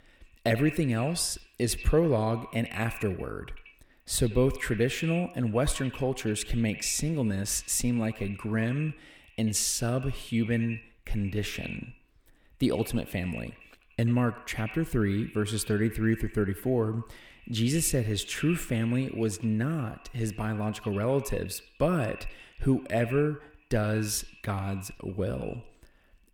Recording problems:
echo of what is said; noticeable; throughout; 90 ms later, 15 dB below the speech

